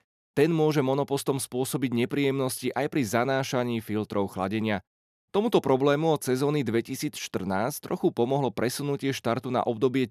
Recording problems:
none

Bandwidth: 14 kHz